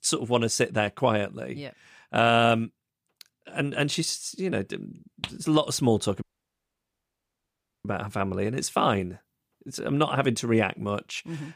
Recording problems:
audio cutting out; at 6 s for 1.5 s

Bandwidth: 15 kHz